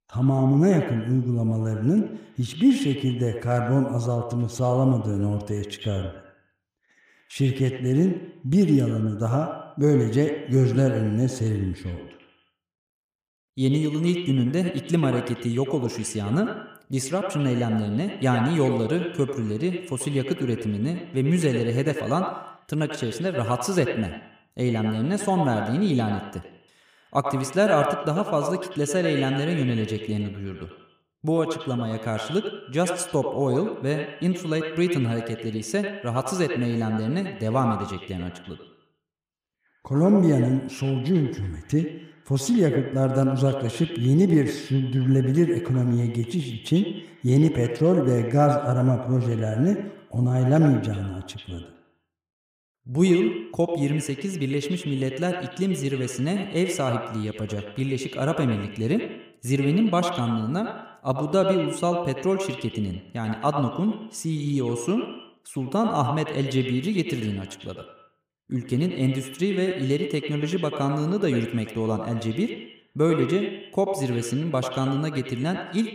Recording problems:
echo of what is said; strong; throughout; 90 ms later, 8 dB below the speech

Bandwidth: 15 kHz